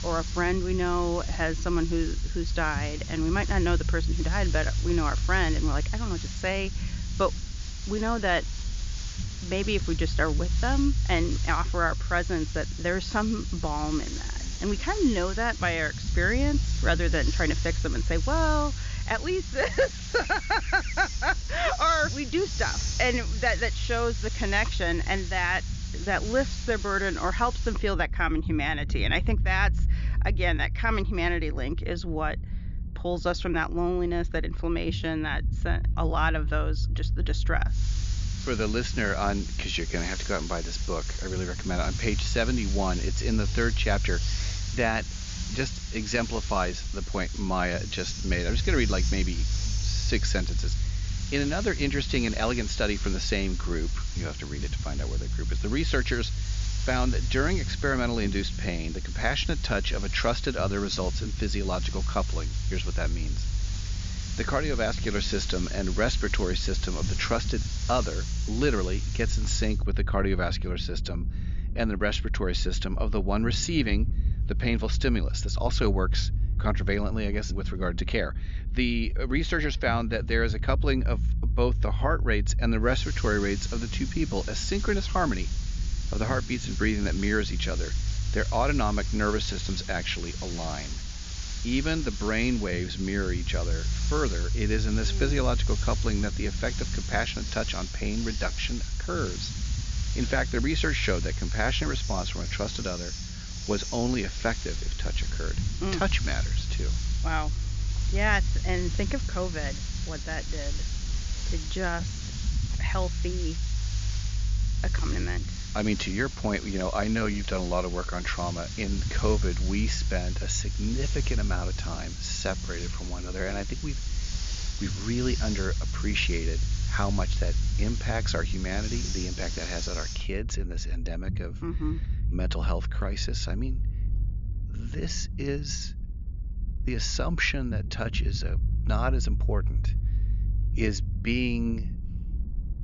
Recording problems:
high frequencies cut off; noticeable; nothing above 7 kHz
hiss; loud; until 28 s, from 38 s to 1:10 and from 1:23 to 2:10; 10 dB below the speech
low rumble; noticeable; throughout; 20 dB below the speech

